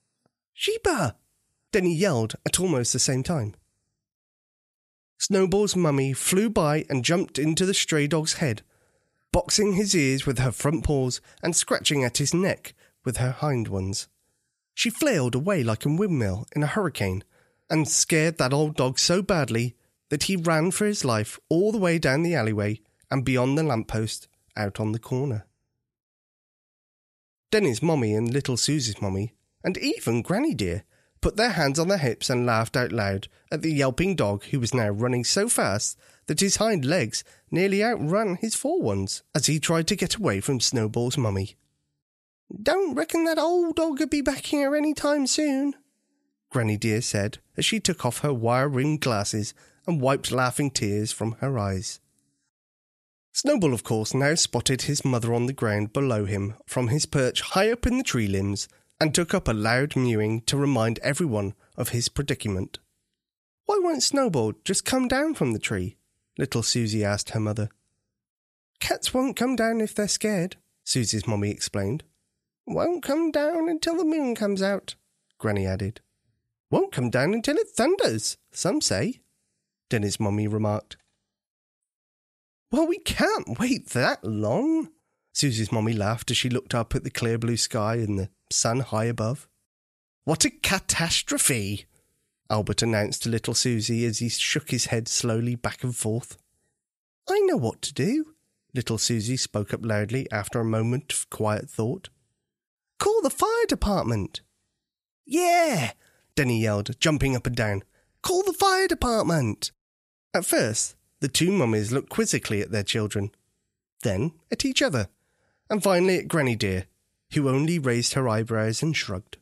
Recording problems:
none

